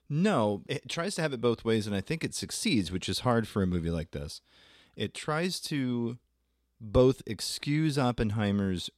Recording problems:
none

